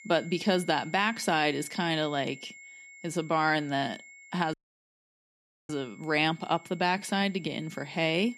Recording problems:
high-pitched whine; noticeable; throughout; 2 kHz, 20 dB below the speech
audio cutting out; at 4.5 s for 1 s

